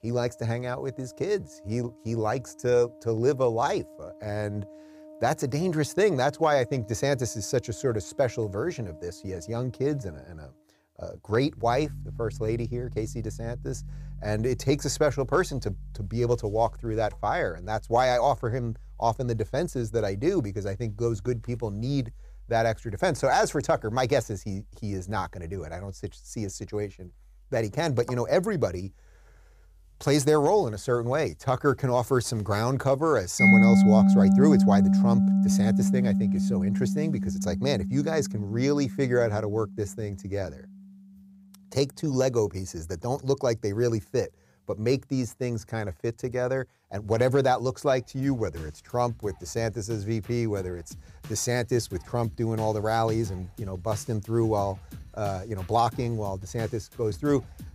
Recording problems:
background music; very loud; throughout; 3 dB above the speech

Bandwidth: 15 kHz